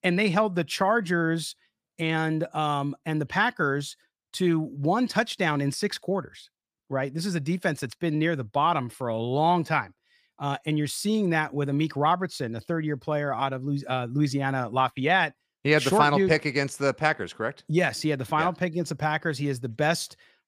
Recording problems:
none

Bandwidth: 15 kHz